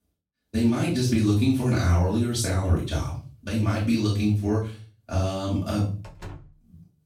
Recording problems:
off-mic speech; far
room echo; noticeable; dies away in 0.4 s
door banging; faint; at 6 s; peak 15 dB below the speech

